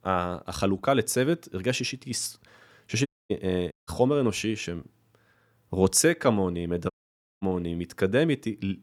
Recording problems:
audio cutting out; at 3 s, at 3.5 s and at 7 s for 0.5 s

